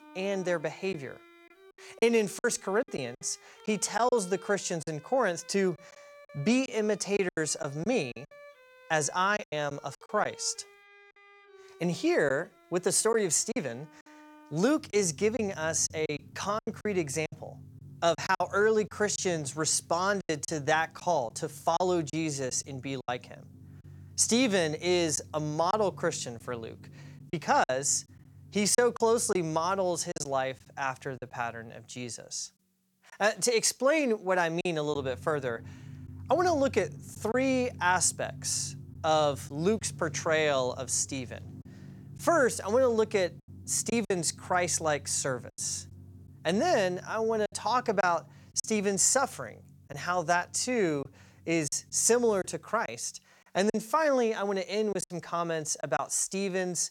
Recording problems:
background music; faint; throughout; 20 dB below the speech
choppy; very; 6% of the speech affected

